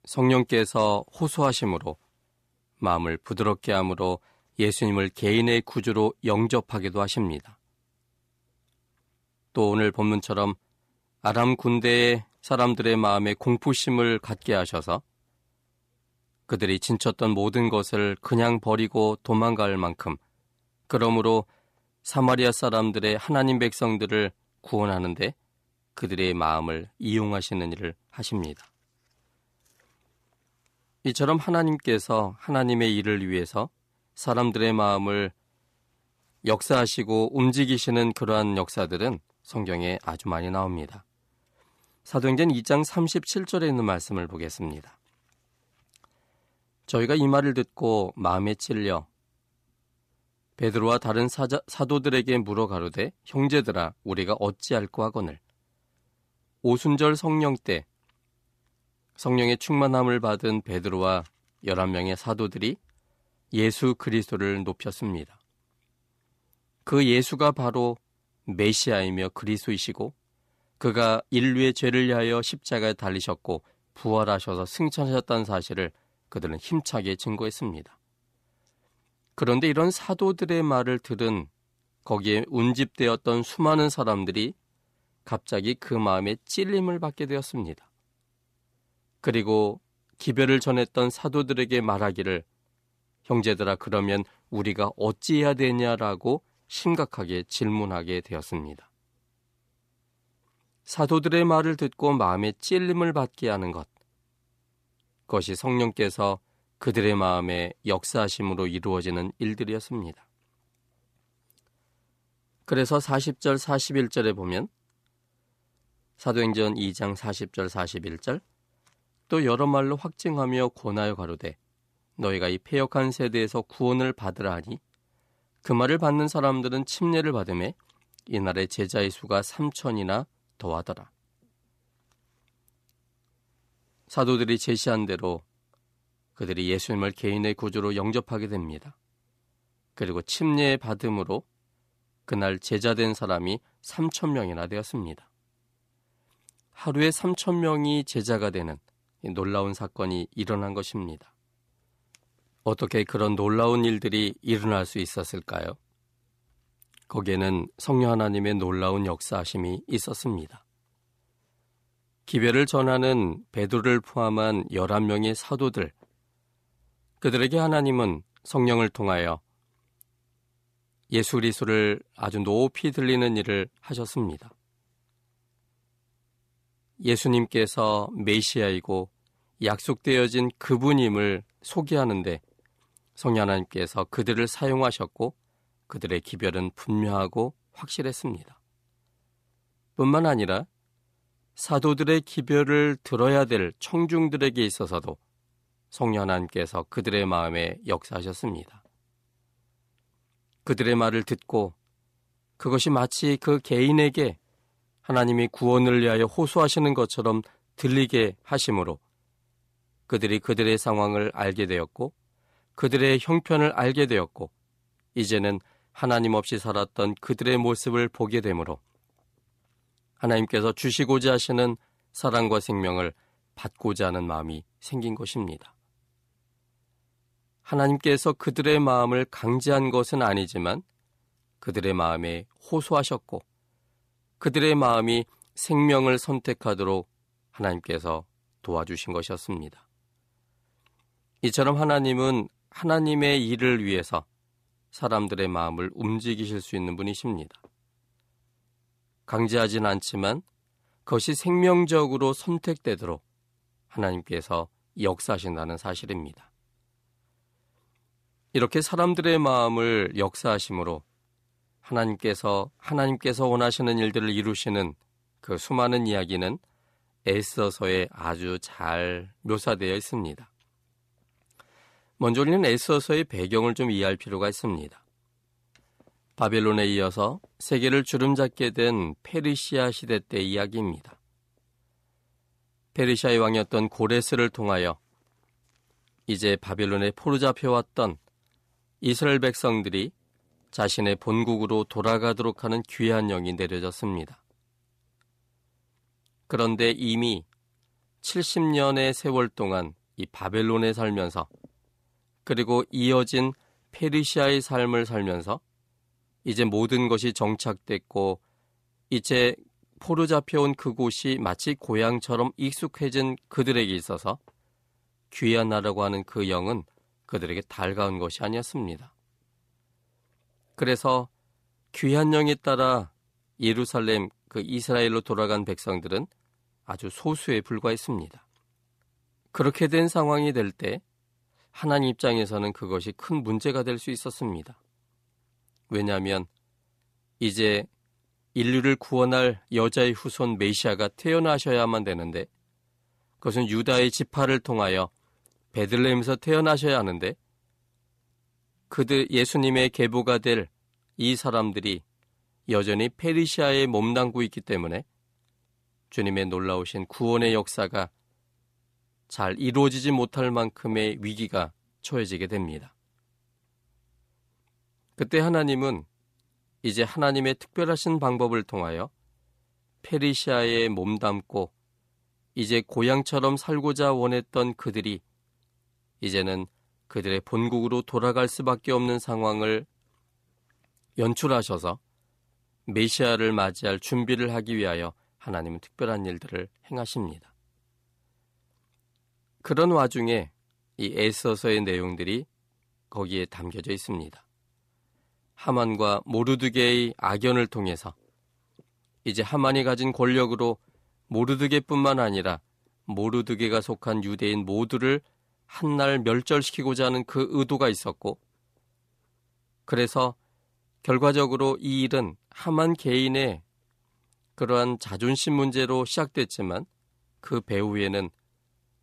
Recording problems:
none

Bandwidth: 14.5 kHz